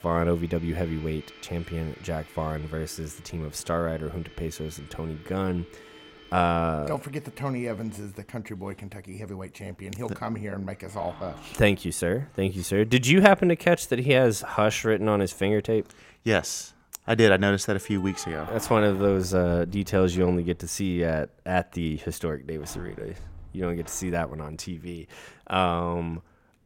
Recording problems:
household noises; faint; throughout; 20 dB below the speech

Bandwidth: 16 kHz